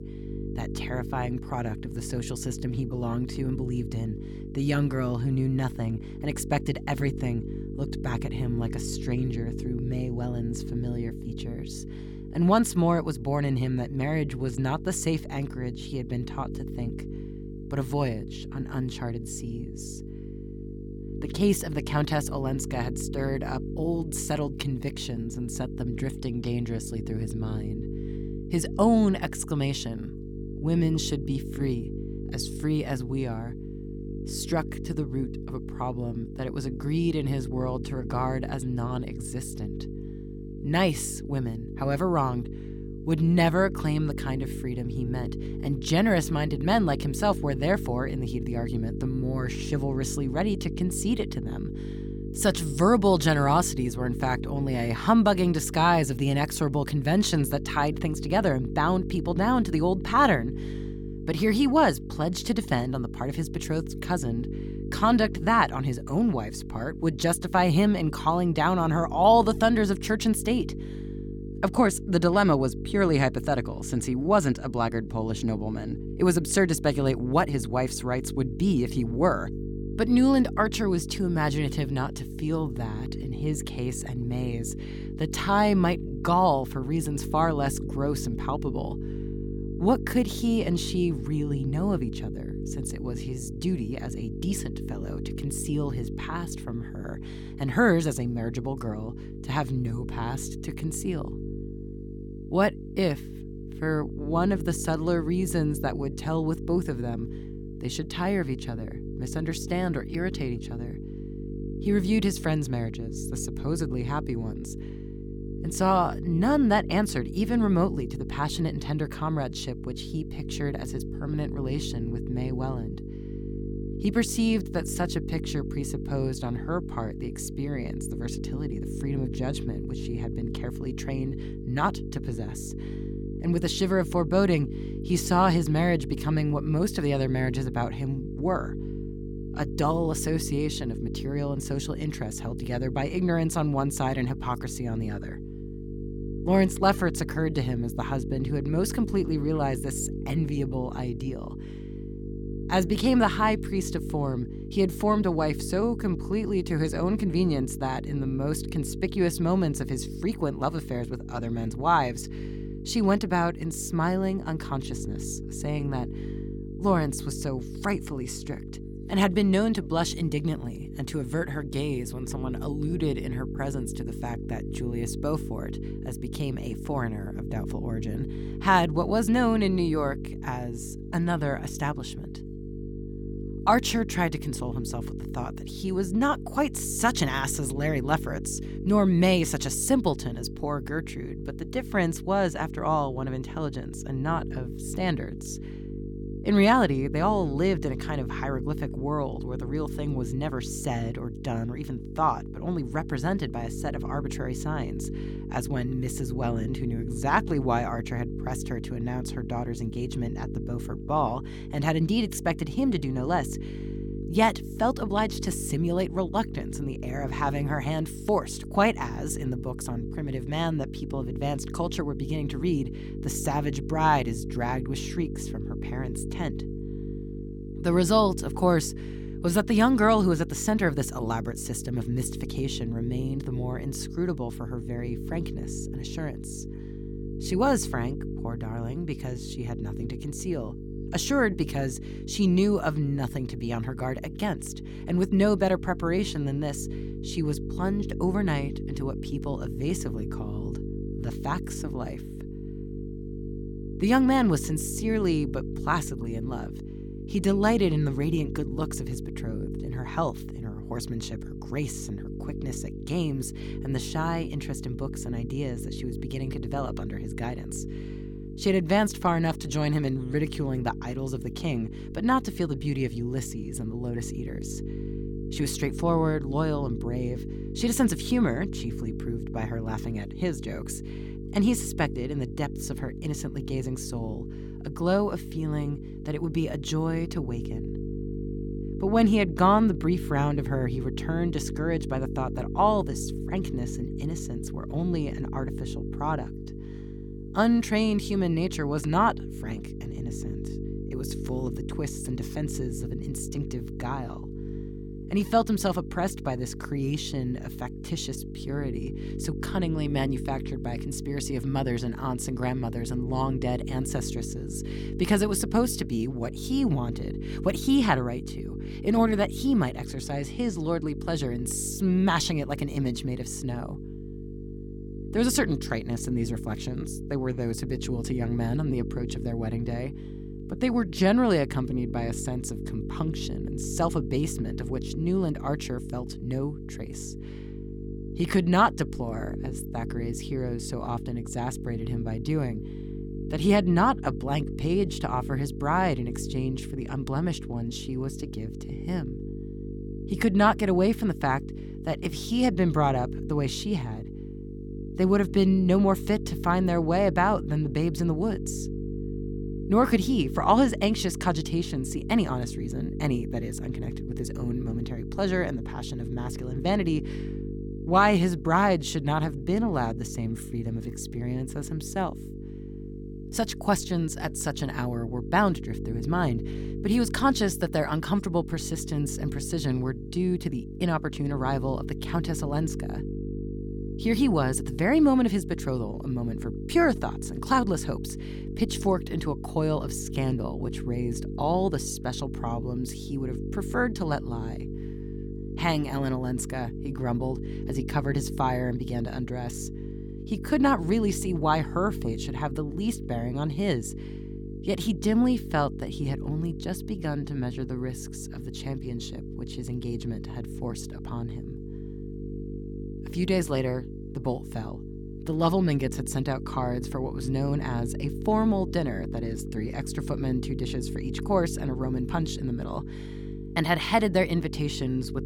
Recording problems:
electrical hum; noticeable; throughout; 50 Hz, 10 dB below the speech

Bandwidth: 17.5 kHz